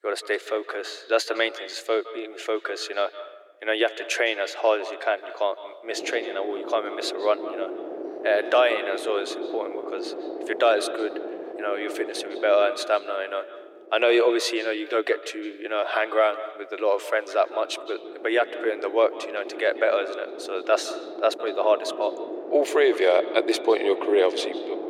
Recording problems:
thin; very; fading below 350 Hz
echo of what is said; noticeable; throughout; 160 ms later, 15 dB below the speech
wind noise on the microphone; occasional gusts; from 6 to 14 s and from 17 s on; 10 dB below the speech

